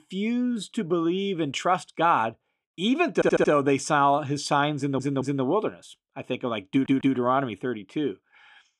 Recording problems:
audio stuttering; at 3 s, at 5 s and at 6.5 s

